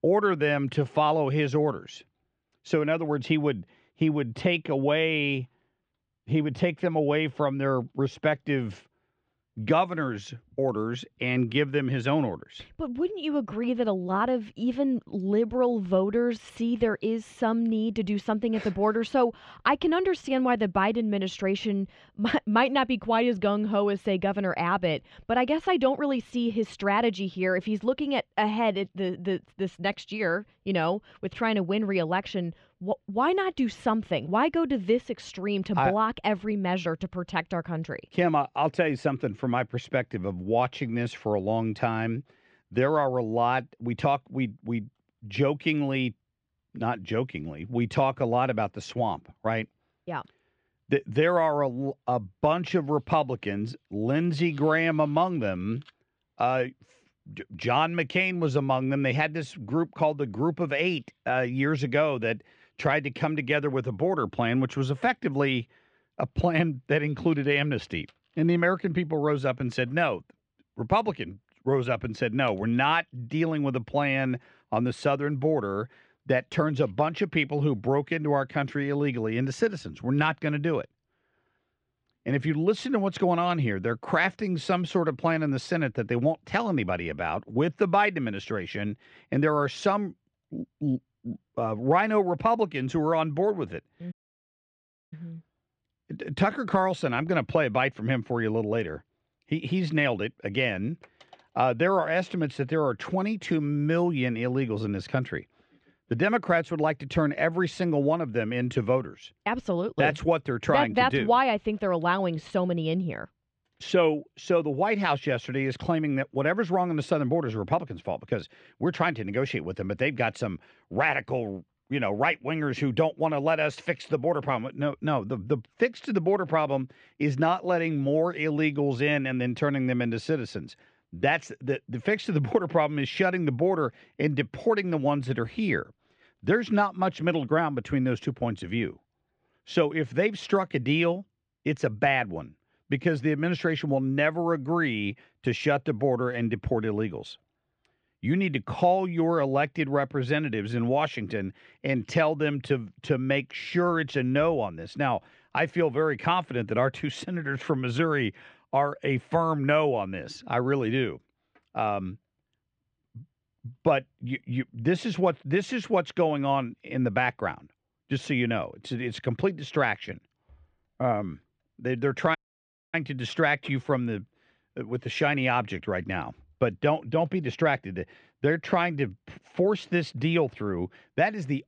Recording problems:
muffled; slightly; fading above 4 kHz
audio cutting out; at 1:34 for 1 s and at 2:52 for 0.5 s

